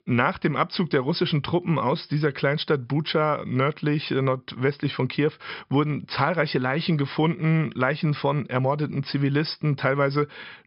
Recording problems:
high frequencies cut off; noticeable; nothing above 5.5 kHz

